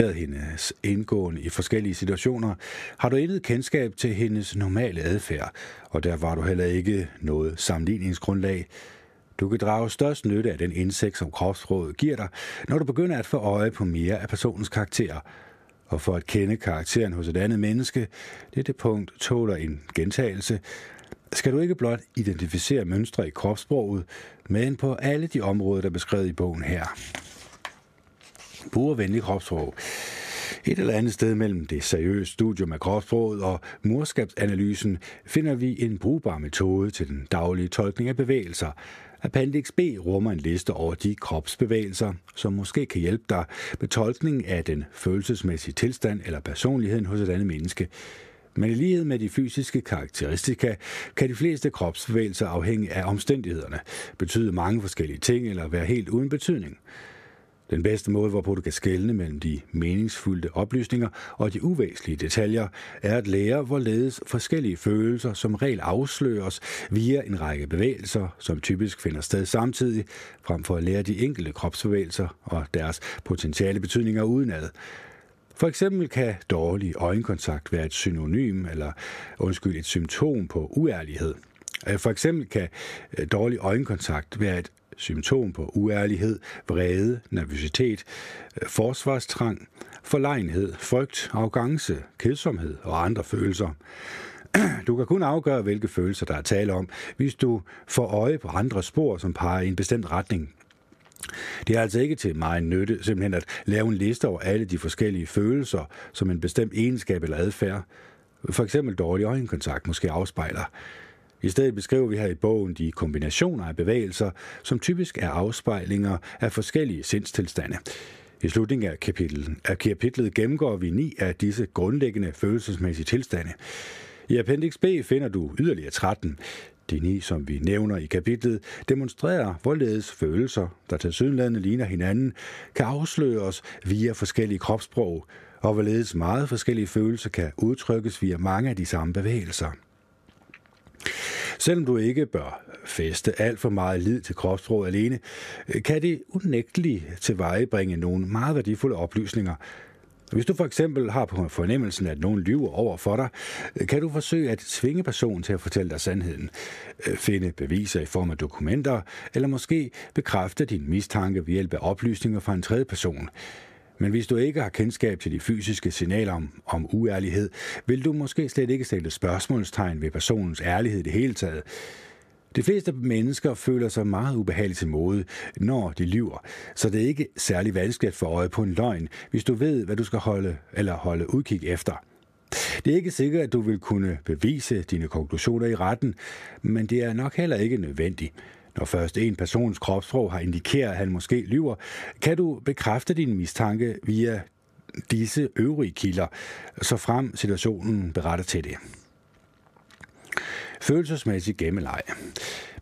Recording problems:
squashed, flat; somewhat
abrupt cut into speech; at the start

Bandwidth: 14.5 kHz